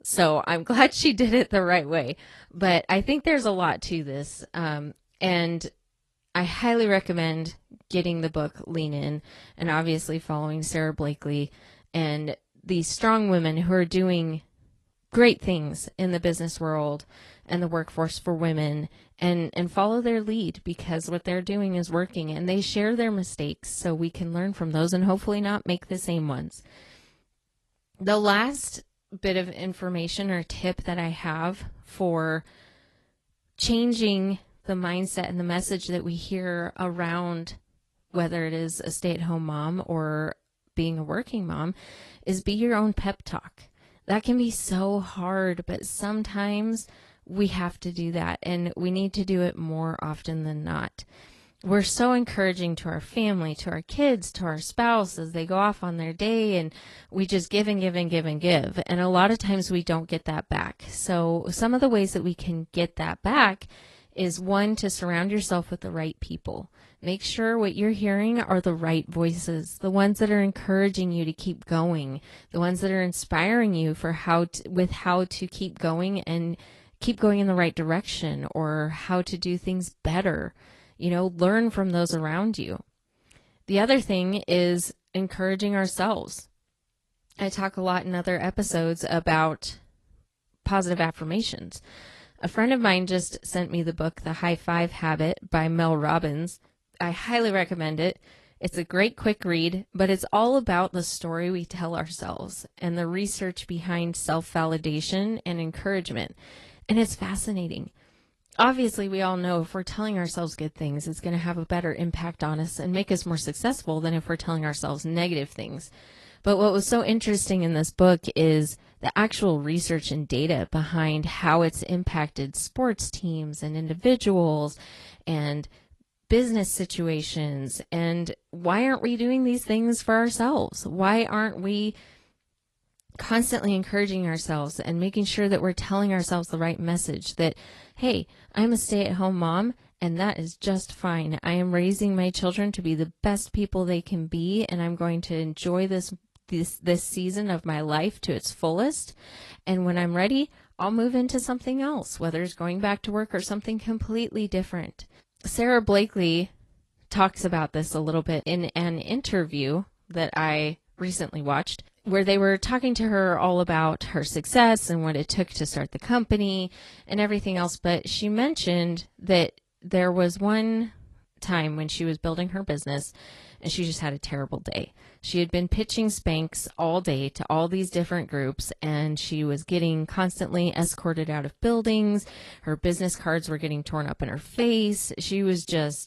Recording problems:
garbled, watery; slightly; nothing above 11.5 kHz

